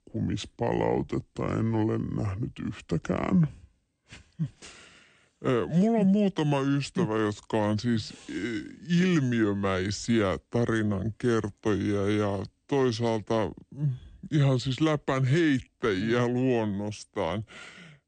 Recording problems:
wrong speed and pitch; too slow and too low; 0.7 times normal speed

